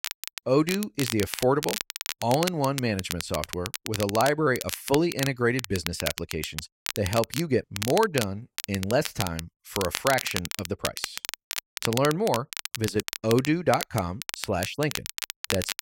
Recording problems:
crackle, like an old record; loud; 6 dB below the speech

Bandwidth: 16 kHz